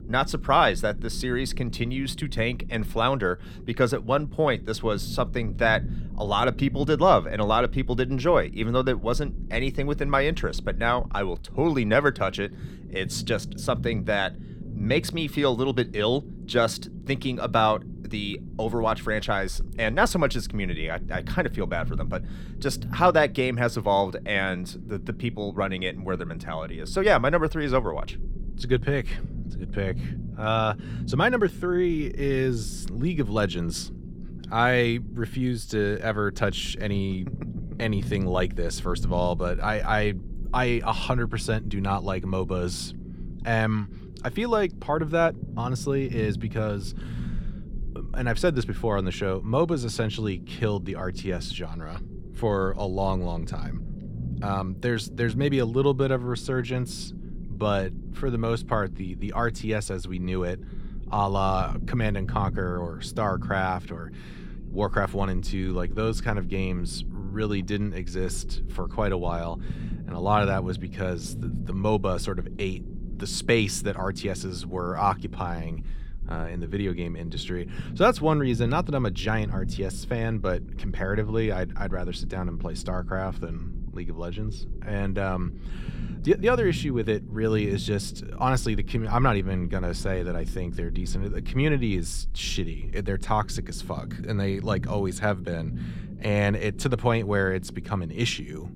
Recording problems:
low rumble; faint; throughout; 20 dB below the speech

